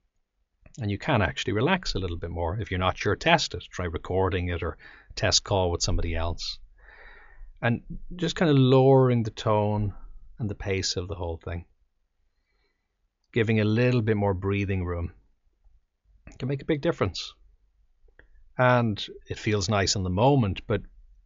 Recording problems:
high frequencies cut off; noticeable; nothing above 7 kHz

